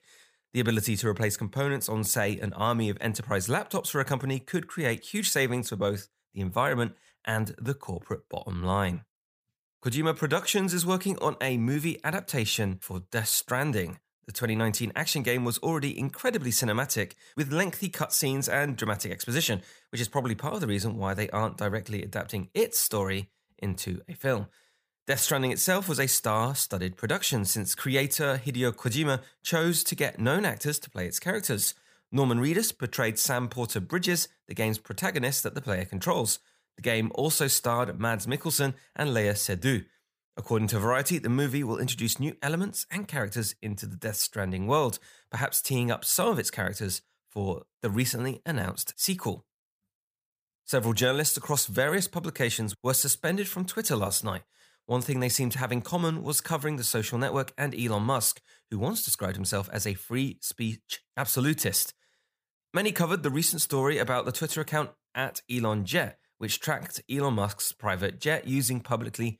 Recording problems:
none

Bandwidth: 15 kHz